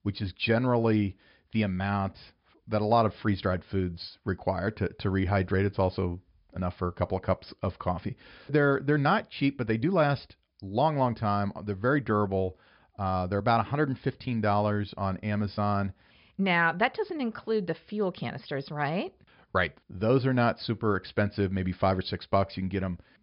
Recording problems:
high frequencies cut off; noticeable; nothing above 5.5 kHz

